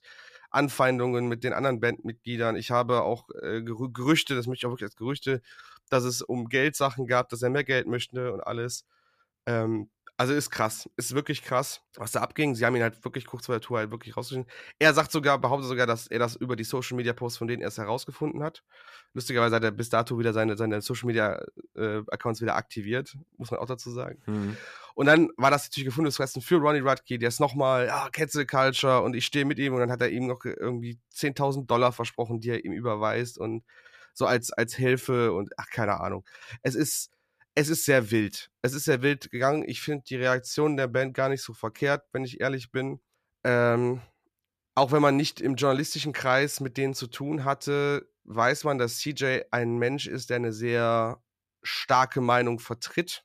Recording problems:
none

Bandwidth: 14.5 kHz